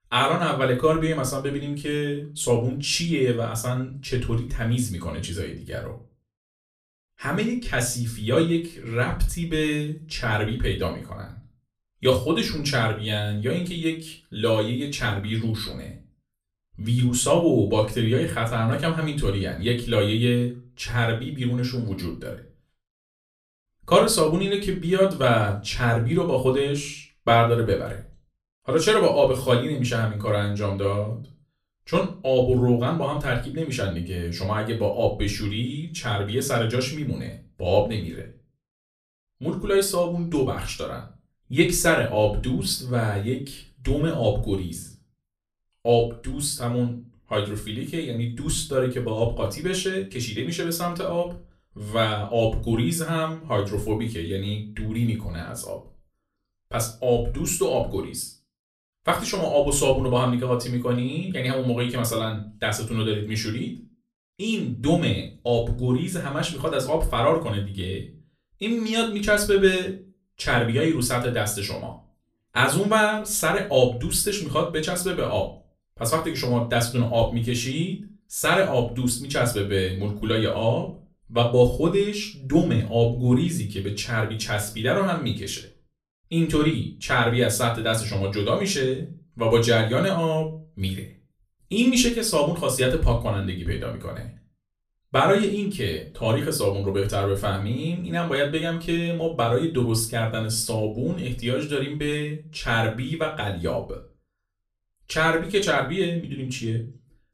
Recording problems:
off-mic speech; far
room echo; very slight; dies away in 0.3 s

